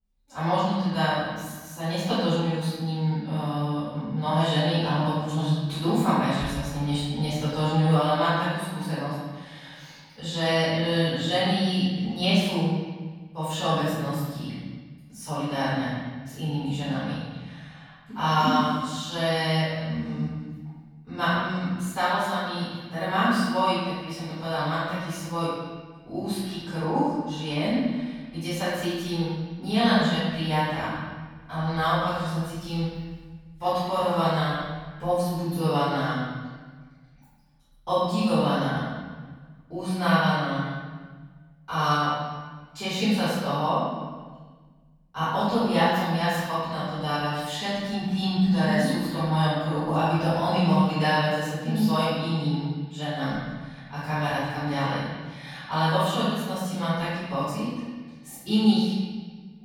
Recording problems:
room echo; strong; dies away in 1.4 s
off-mic speech; far

